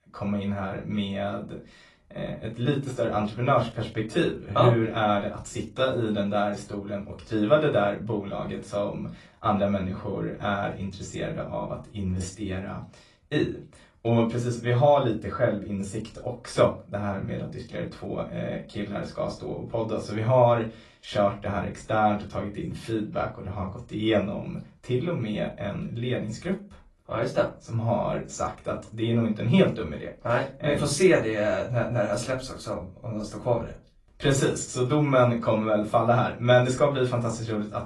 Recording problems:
off-mic speech; far
room echo; very slight; dies away in 0.2 s
garbled, watery; slightly

